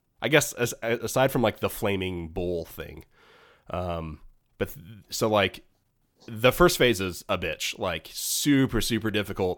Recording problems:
none

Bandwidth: 18 kHz